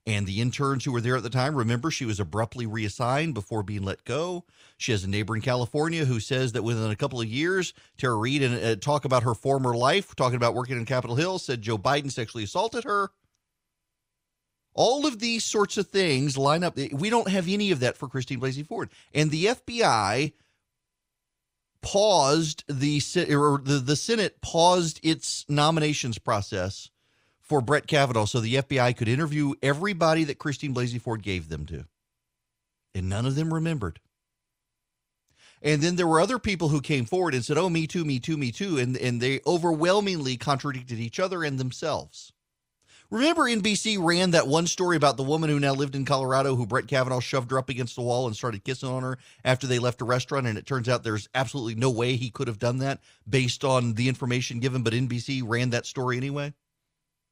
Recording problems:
none

